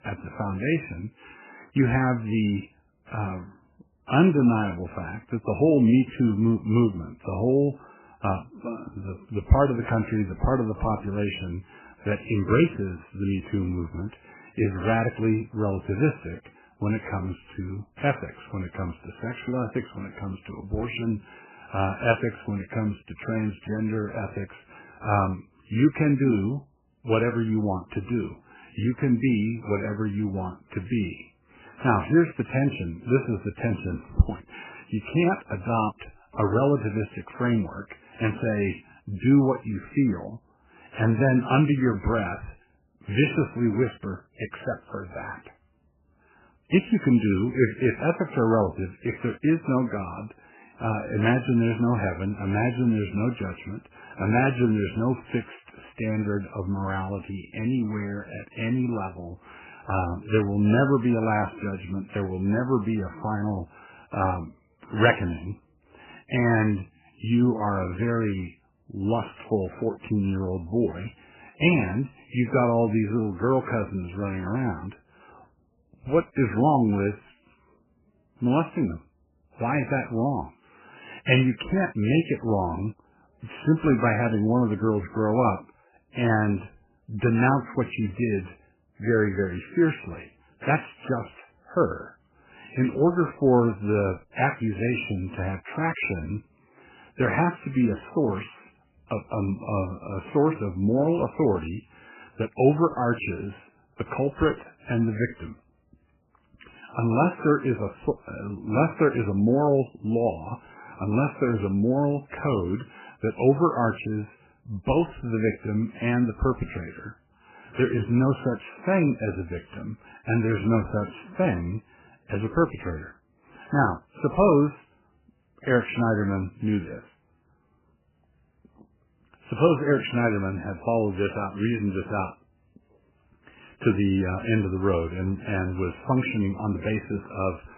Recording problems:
garbled, watery; badly; nothing above 3 kHz

